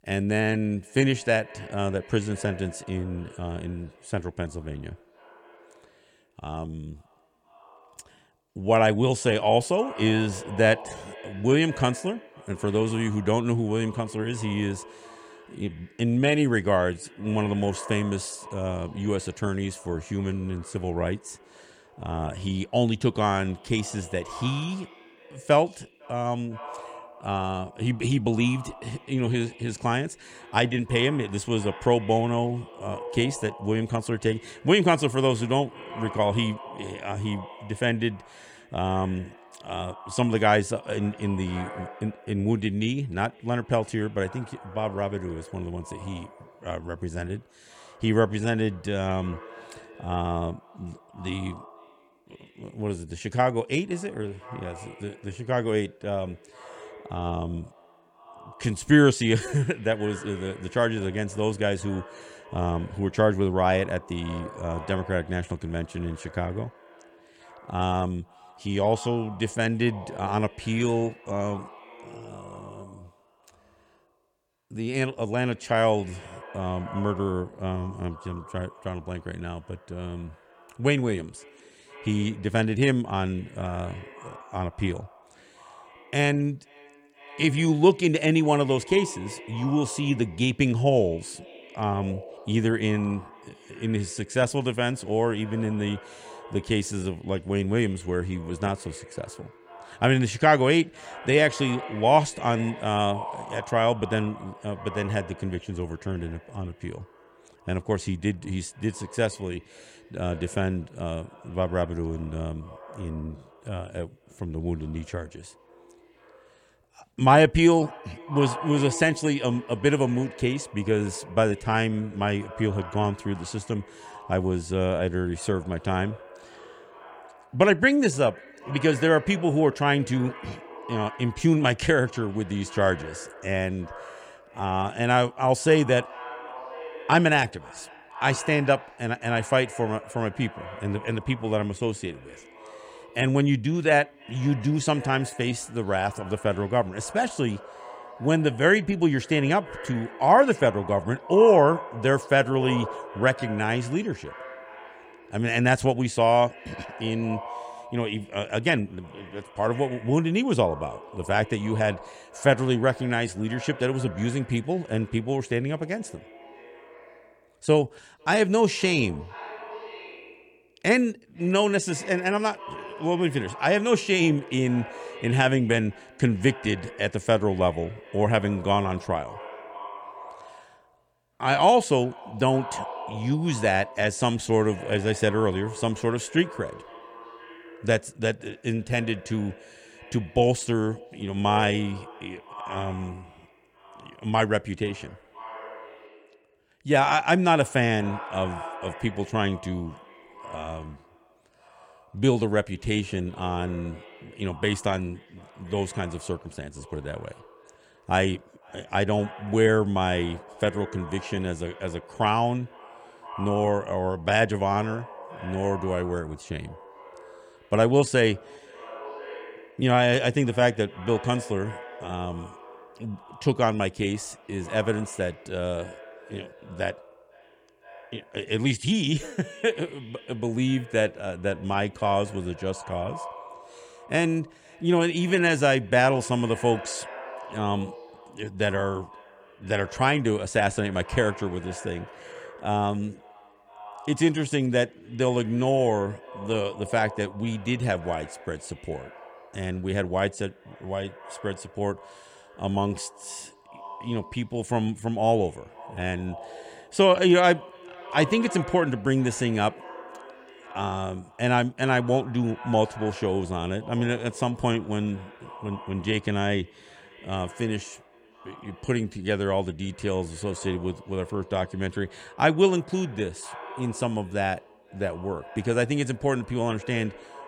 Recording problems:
echo of what is said; noticeable; throughout; 500 ms later, 20 dB below the speech

